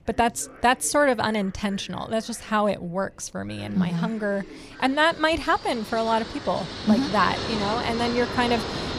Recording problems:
train or aircraft noise; loud; throughout; 7 dB below the speech
voice in the background; faint; throughout; 20 dB below the speech

